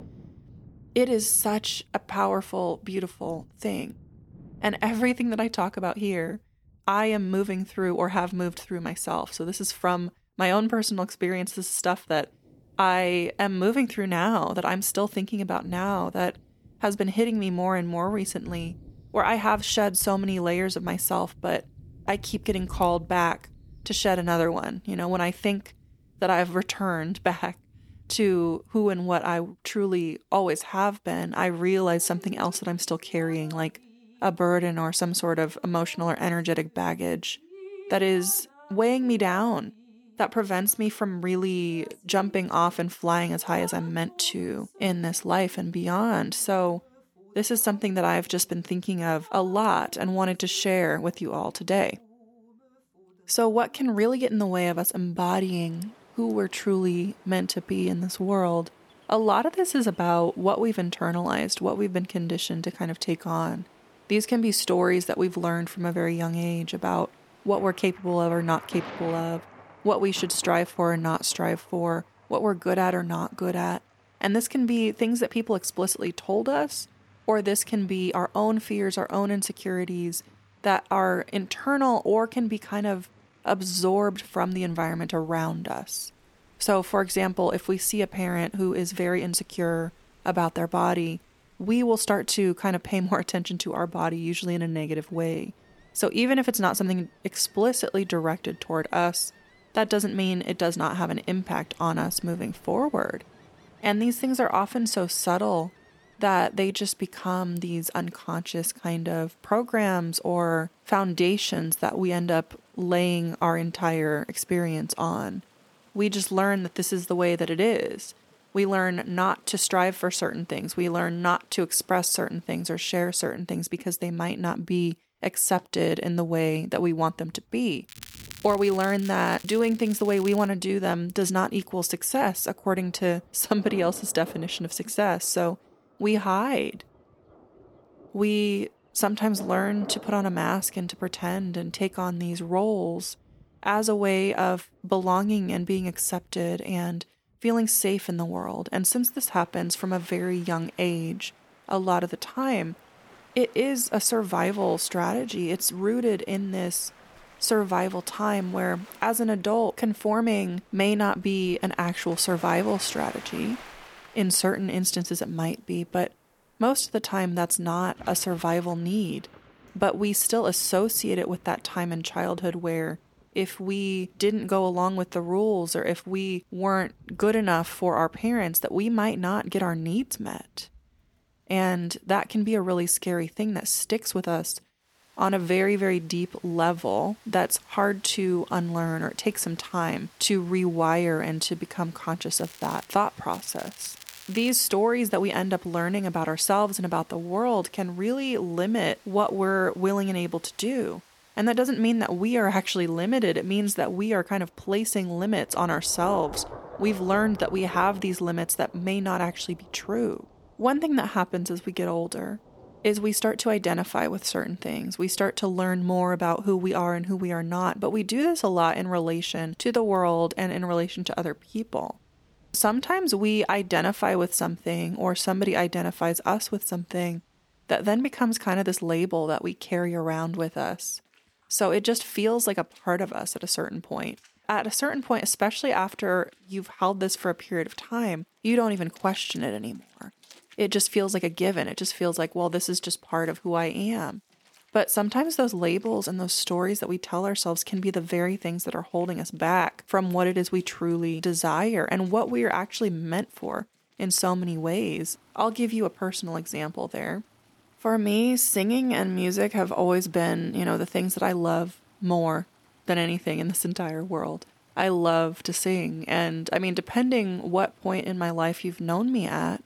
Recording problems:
crackling; noticeable; from 2:08 to 2:10, at 3:12 and from 3:13 to 3:15; 20 dB below the speech
rain or running water; faint; throughout; 25 dB below the speech

